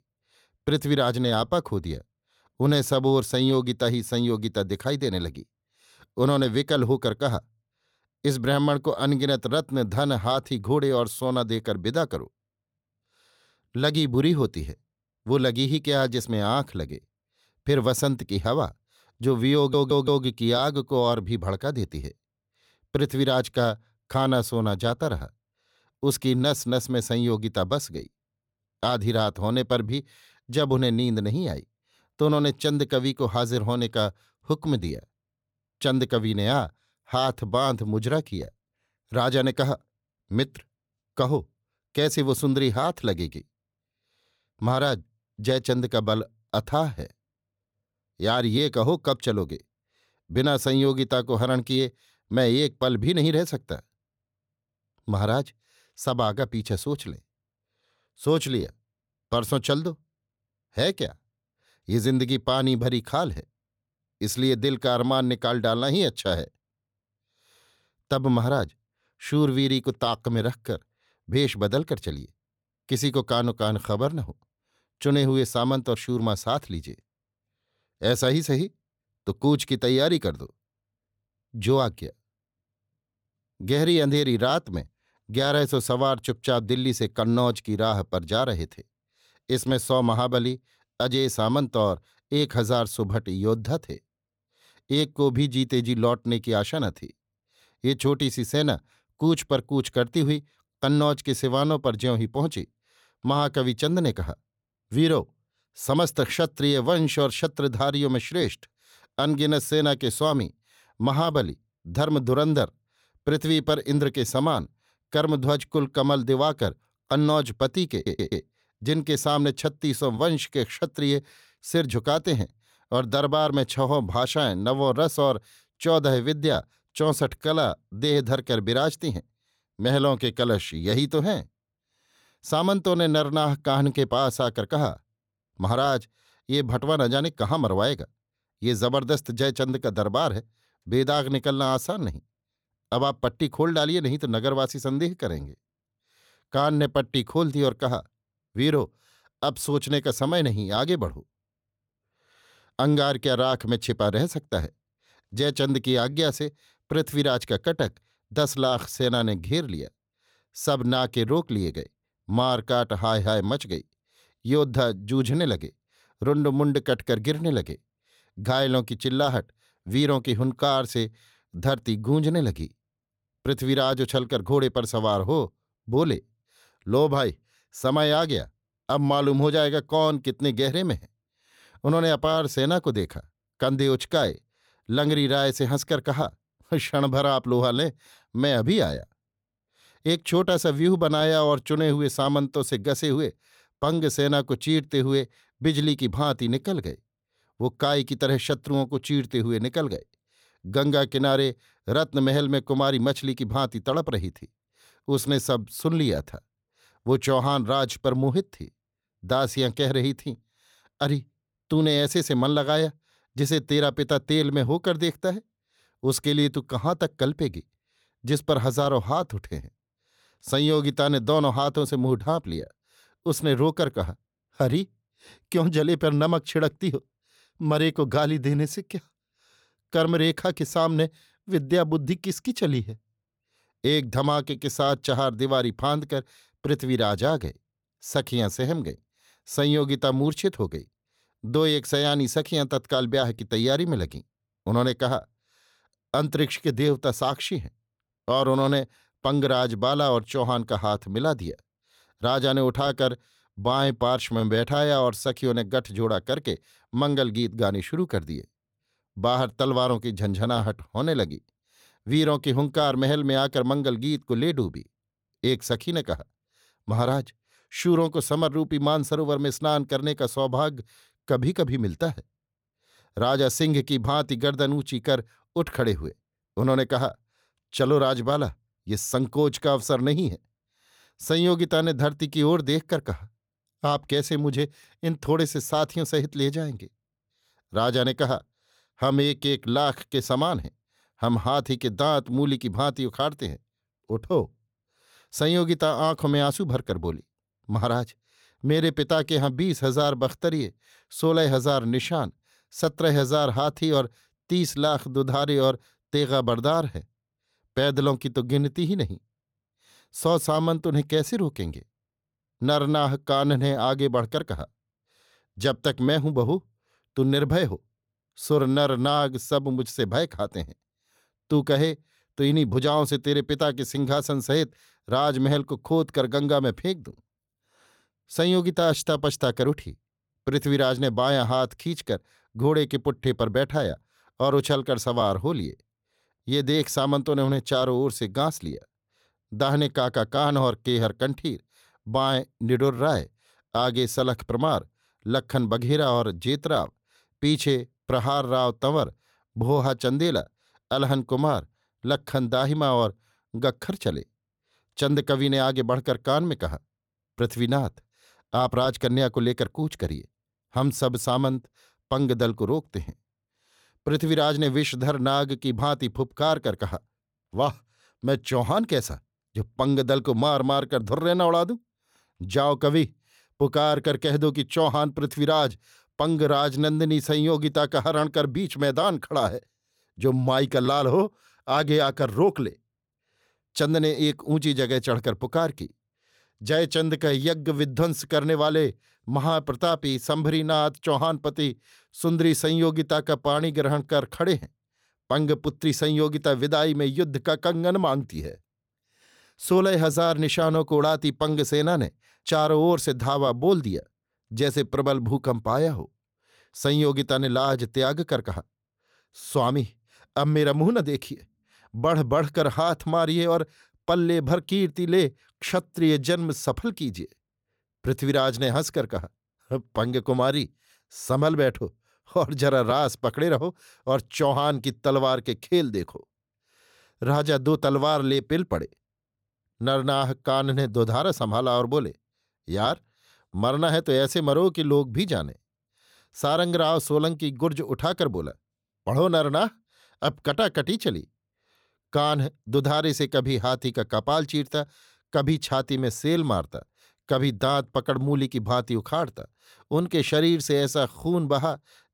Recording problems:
audio stuttering; at 20 s and at 1:58

